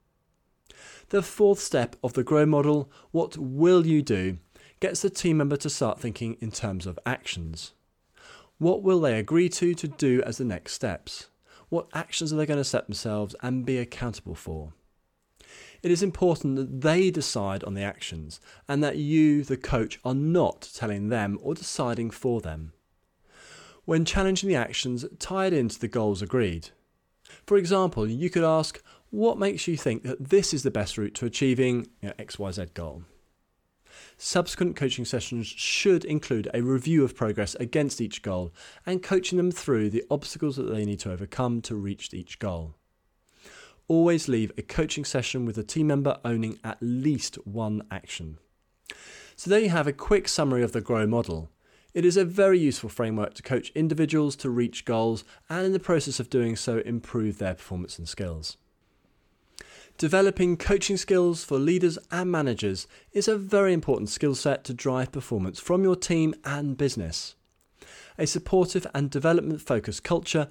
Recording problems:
none

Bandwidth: 18.5 kHz